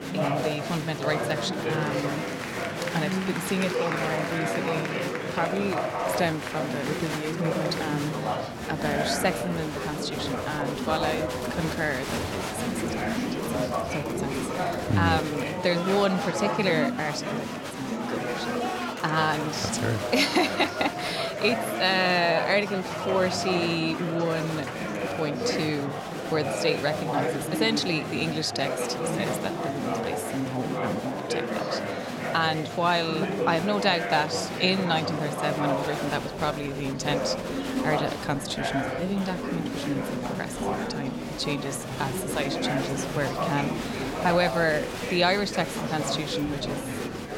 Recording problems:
murmuring crowd; loud; throughout; 2 dB below the speech

